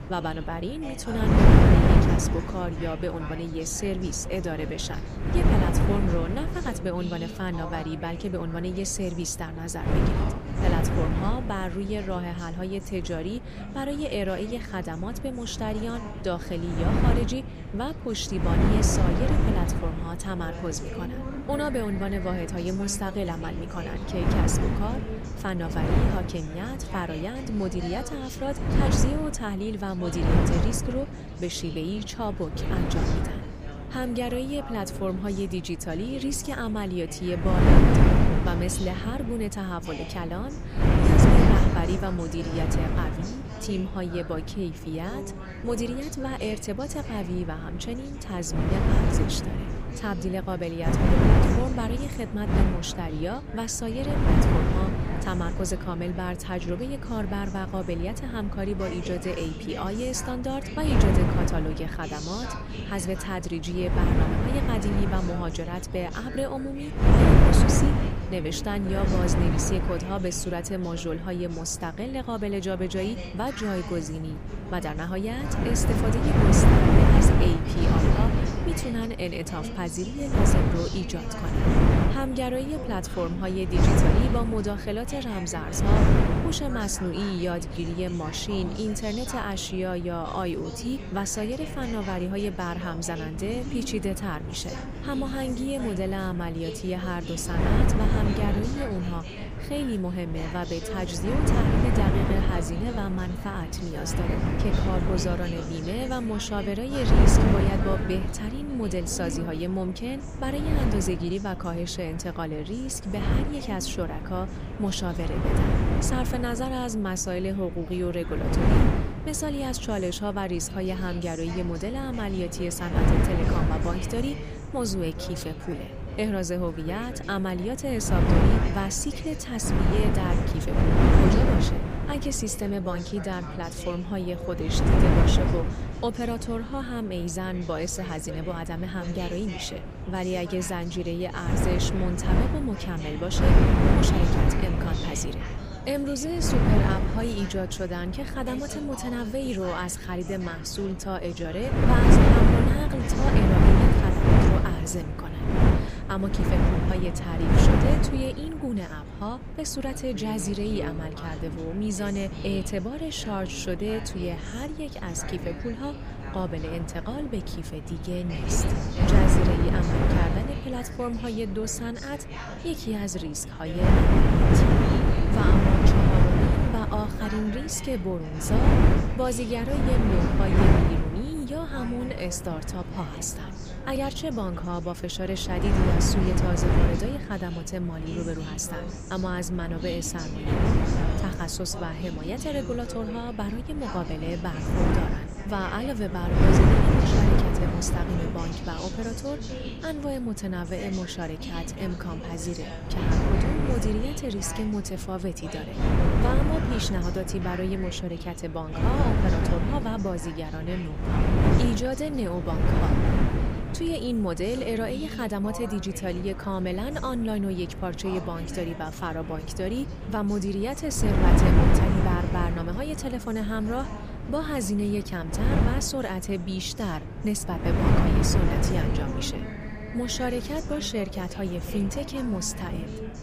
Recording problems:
wind noise on the microphone; heavy; 1 dB above the speech
background chatter; noticeable; throughout; 2 voices, 10 dB below the speech

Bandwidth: 15 kHz